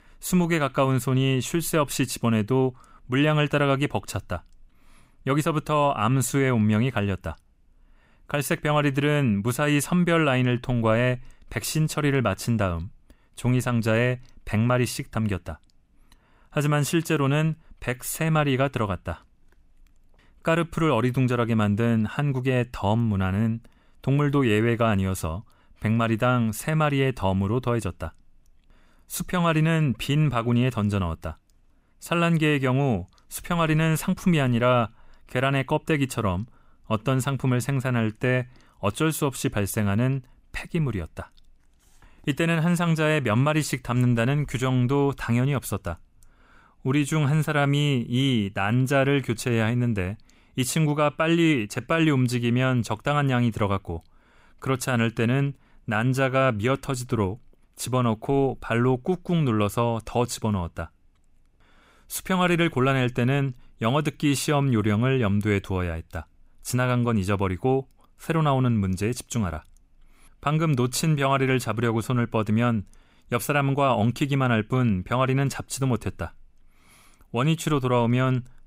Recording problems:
none

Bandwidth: 15.5 kHz